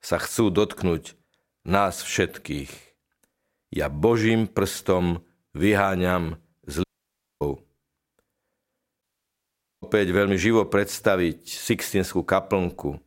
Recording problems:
audio cutting out; at 7 s for 0.5 s and at 9 s for 1 s

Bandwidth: 16 kHz